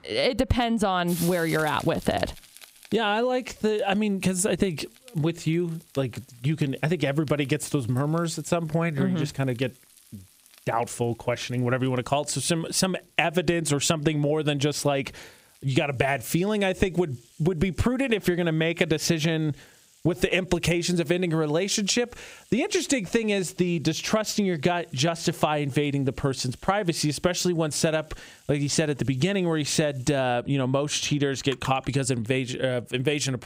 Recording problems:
squashed, flat; somewhat, background pumping
household noises; faint; throughout; 20 dB below the speech

